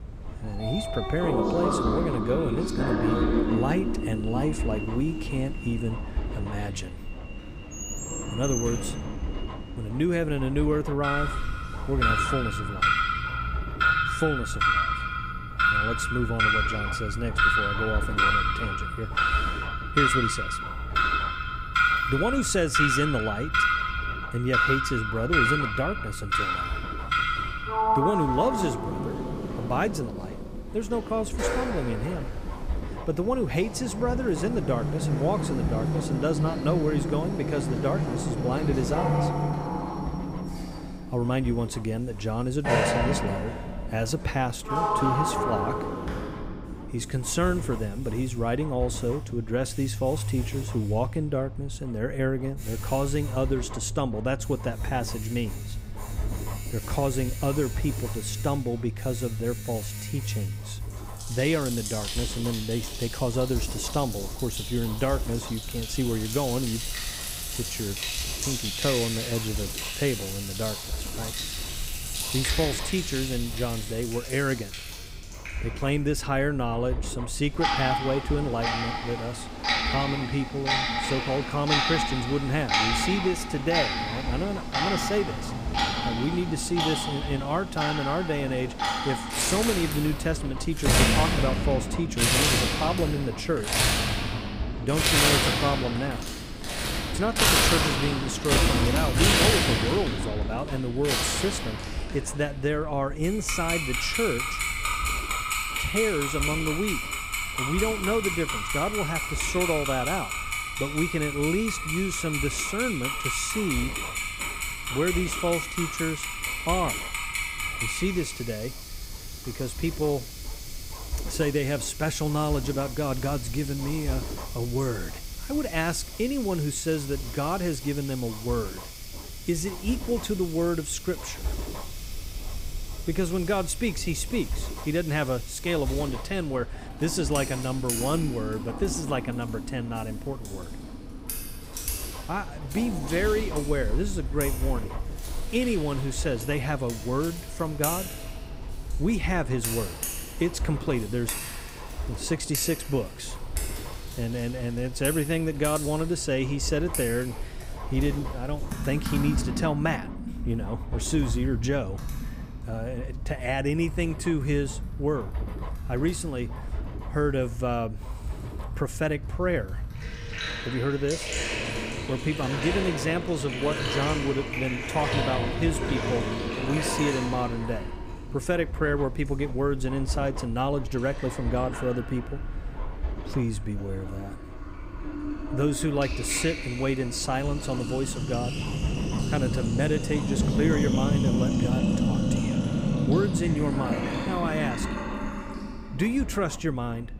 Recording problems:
household noises; very loud; throughout; as loud as the speech
low rumble; noticeable; throughout; 15 dB below the speech

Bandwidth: 15.5 kHz